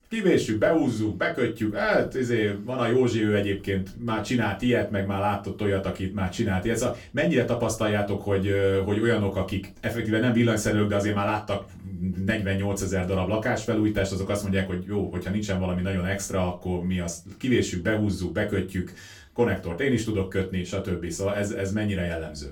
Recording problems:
off-mic speech; far
room echo; very slight; dies away in 0.2 s

